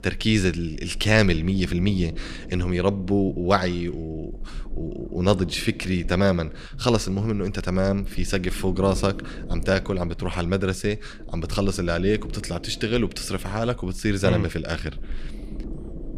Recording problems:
low rumble; faint; throughout; 20 dB below the speech

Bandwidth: 15 kHz